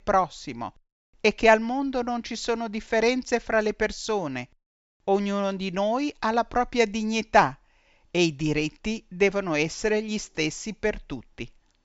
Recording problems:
high frequencies cut off; noticeable; nothing above 8 kHz

